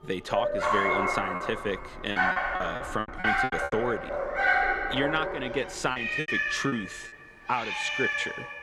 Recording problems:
animal sounds; very loud; throughout; 4 dB above the speech
background music; faint; throughout; 30 dB below the speech
choppy; very; from 1.5 to 3.5 s and at 6 s; 12% of the speech affected

